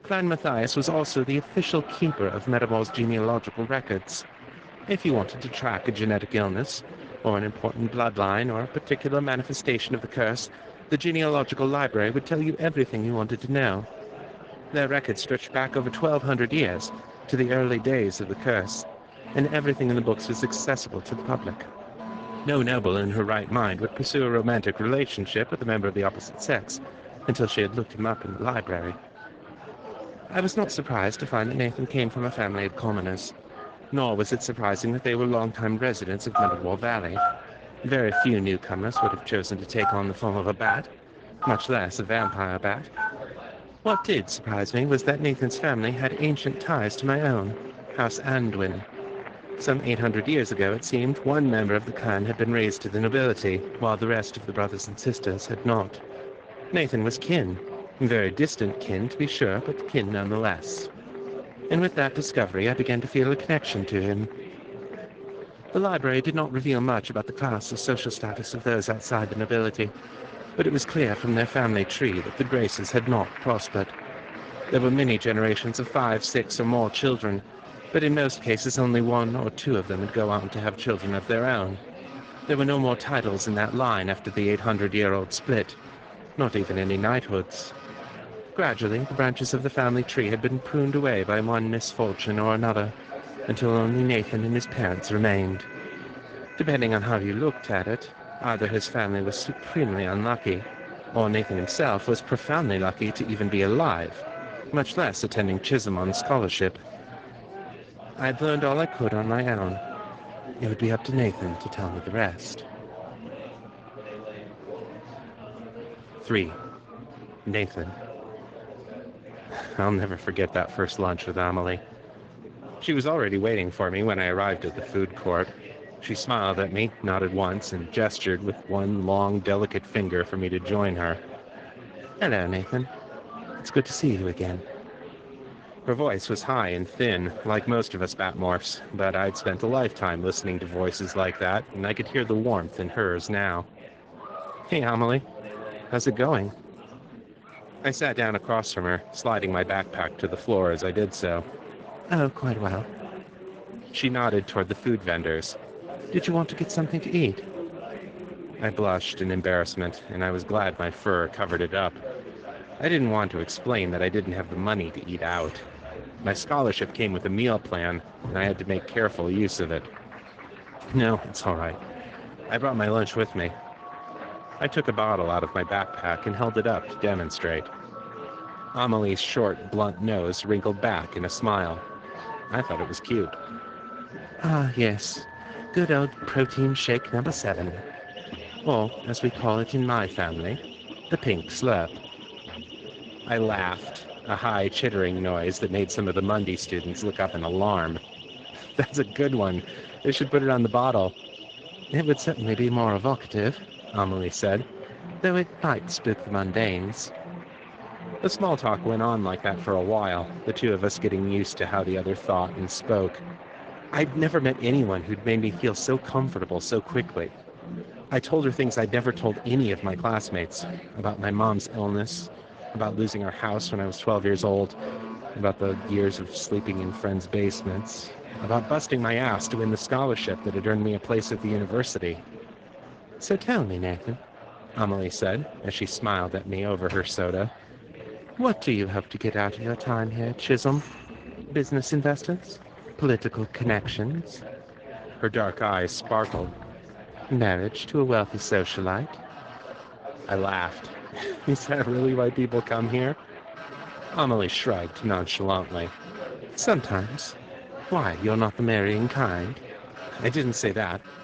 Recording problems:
garbled, watery; slightly
alarms or sirens; noticeable; throughout; 15 dB below the speech
chatter from many people; noticeable; throughout; 15 dB below the speech

